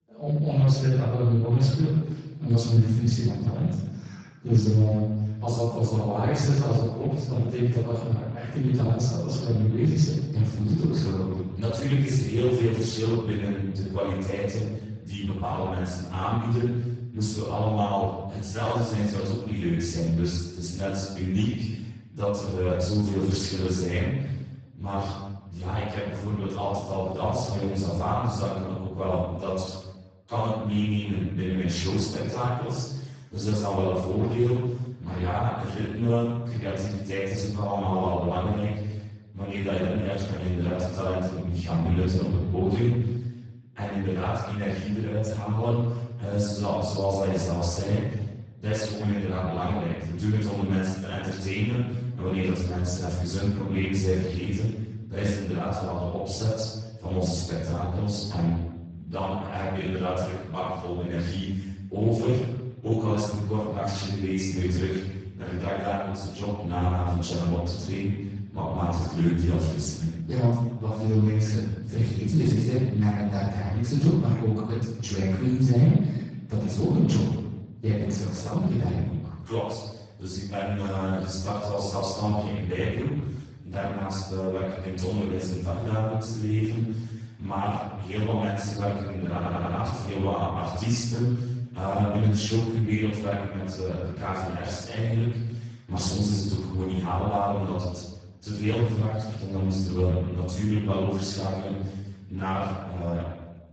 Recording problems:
room echo; strong; dies away in 1 s
off-mic speech; far
garbled, watery; badly; nothing above 7.5 kHz
audio stuttering; at 1:29

